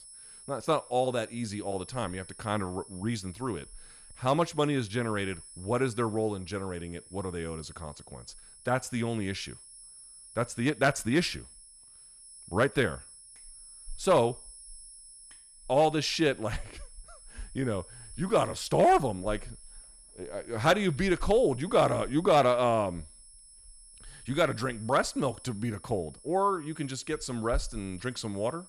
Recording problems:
high-pitched whine; noticeable; throughout; 10.5 kHz, 20 dB below the speech

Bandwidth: 14.5 kHz